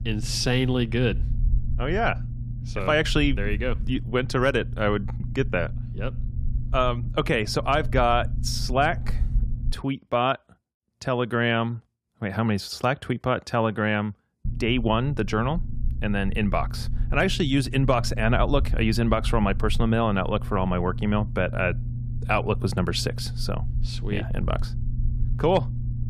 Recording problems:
low rumble; noticeable; until 9.5 s and from 14 s on; 20 dB below the speech

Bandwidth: 14.5 kHz